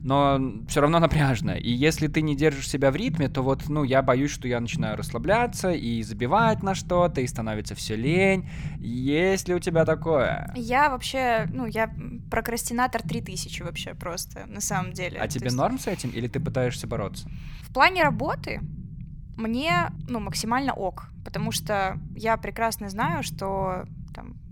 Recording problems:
low rumble; faint; throughout; 20 dB below the speech

